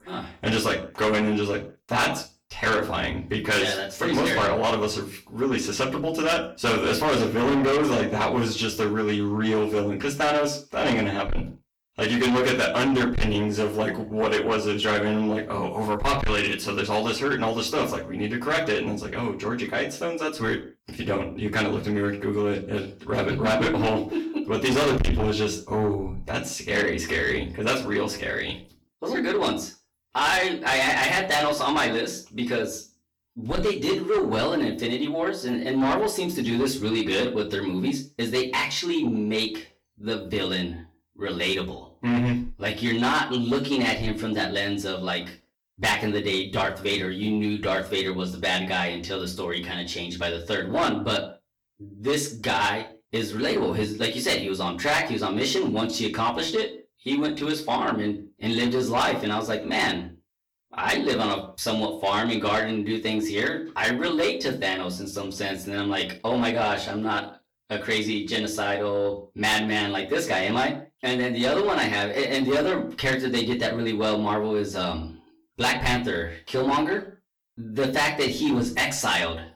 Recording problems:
distortion; heavy; 7 dB below the speech
off-mic speech; far
room echo; slight; dies away in 0.3 s

